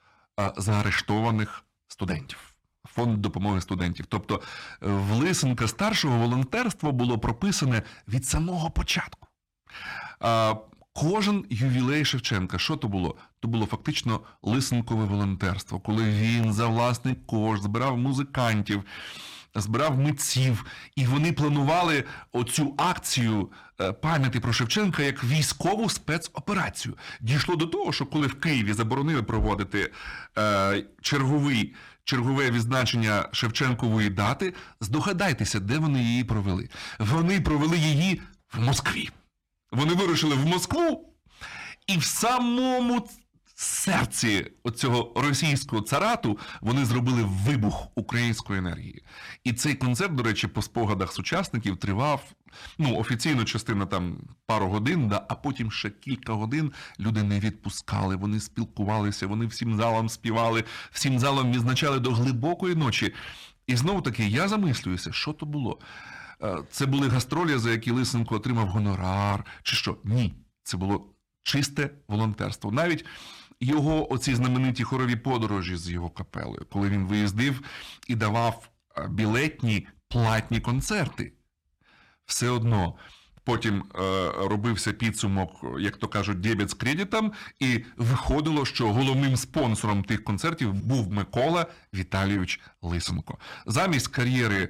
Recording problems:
distortion; slight; 8% of the sound clipped

